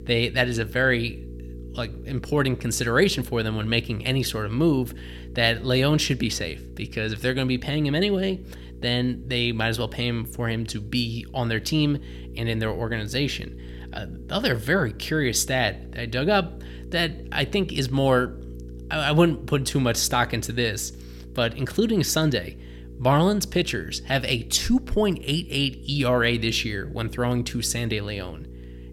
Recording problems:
electrical hum; faint; throughout; 60 Hz, 25 dB below the speech

